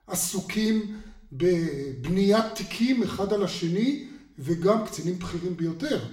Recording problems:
room echo; slight; dies away in 0.6 s
off-mic speech; somewhat distant

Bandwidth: 16.5 kHz